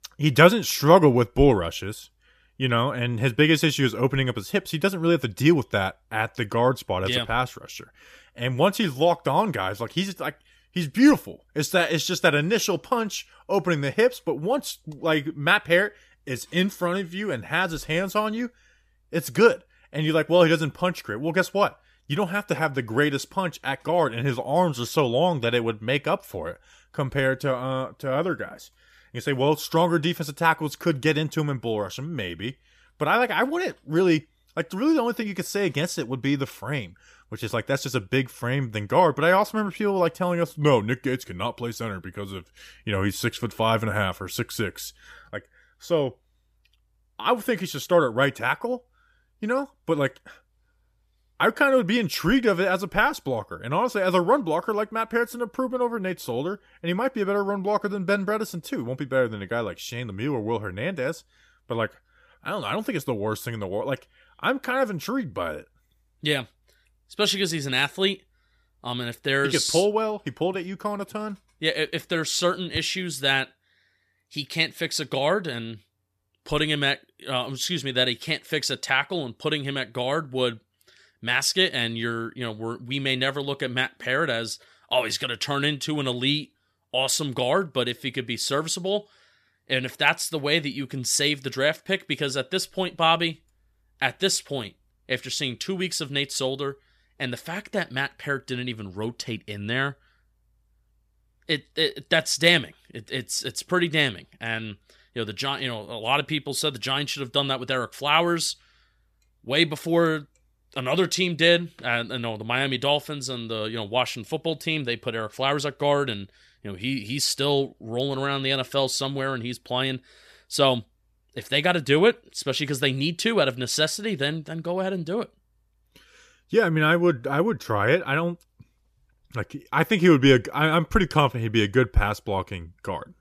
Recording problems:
none

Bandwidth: 14.5 kHz